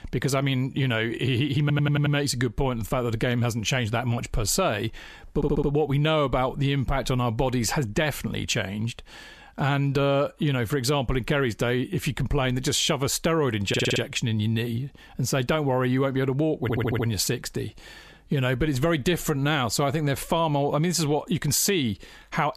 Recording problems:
squashed, flat; somewhat
audio stuttering; 4 times, first at 1.5 s

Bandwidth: 14.5 kHz